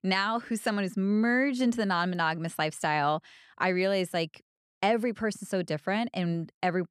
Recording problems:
none

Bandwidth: 14 kHz